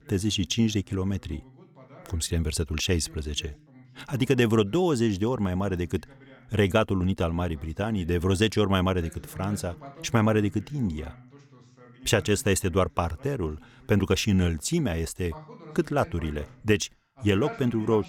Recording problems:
voice in the background; faint; throughout; 20 dB below the speech

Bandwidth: 17.5 kHz